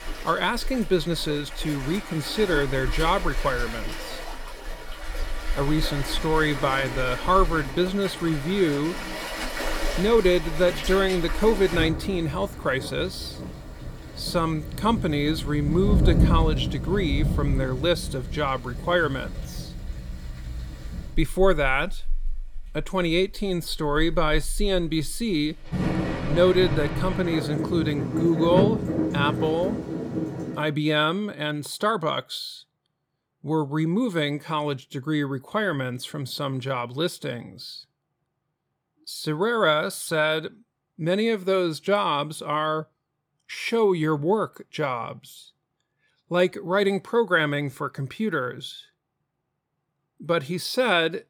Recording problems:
rain or running water; loud; until 31 s; 6 dB below the speech

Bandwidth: 18 kHz